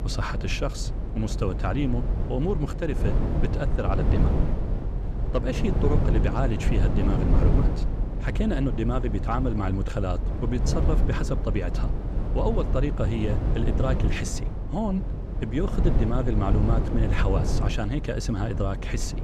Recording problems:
low rumble; loud; throughout; 5 dB below the speech

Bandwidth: 14.5 kHz